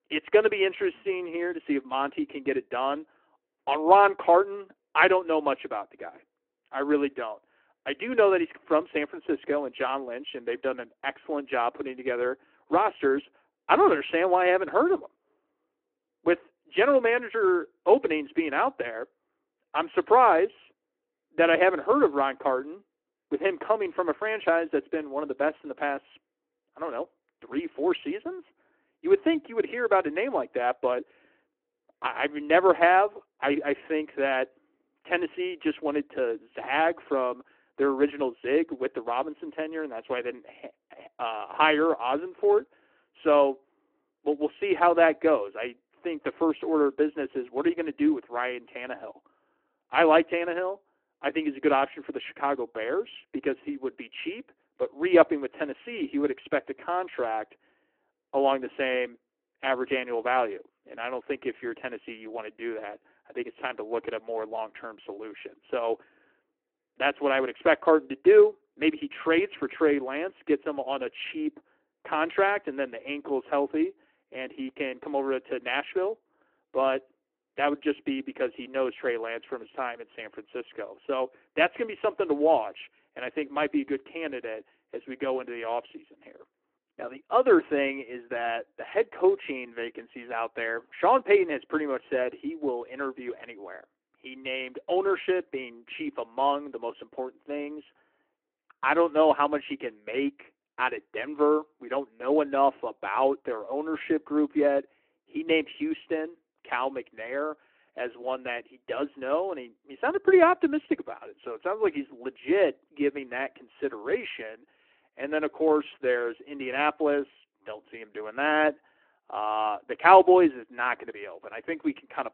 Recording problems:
phone-call audio

